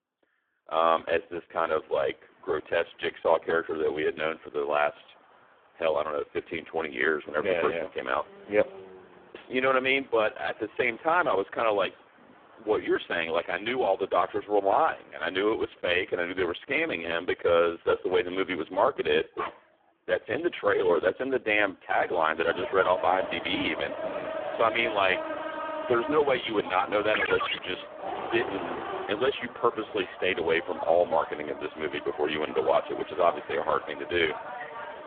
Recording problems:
phone-call audio; poor line
traffic noise; loud; throughout; 10 dB below the speech
dog barking; noticeable; at 19 s; peak 9 dB below the speech
phone ringing; noticeable; at 27 s; peak 3 dB below the speech

